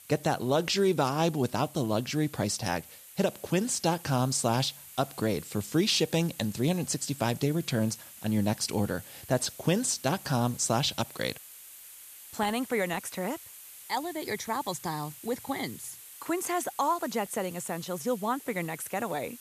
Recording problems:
hiss; noticeable; throughout; 15 dB below the speech

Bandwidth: 14.5 kHz